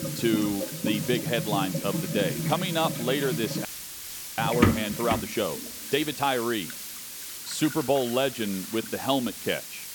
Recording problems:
household noises; loud; throughout; 3 dB below the speech
hiss; loud; throughout; 7 dB below the speech
background music; faint; throughout; 25 dB below the speech
audio freezing; at 3.5 s for 0.5 s

